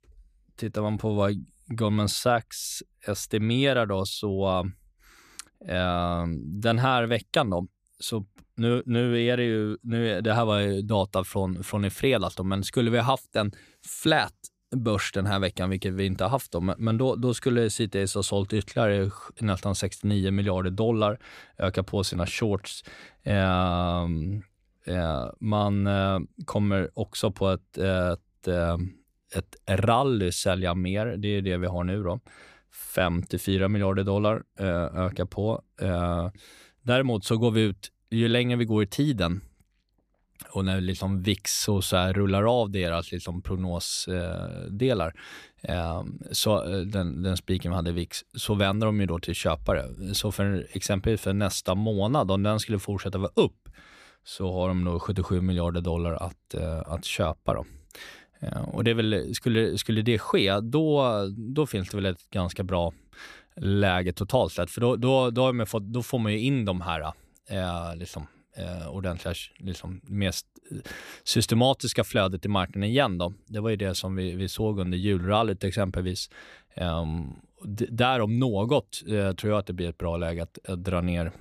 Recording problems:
none

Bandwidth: 14.5 kHz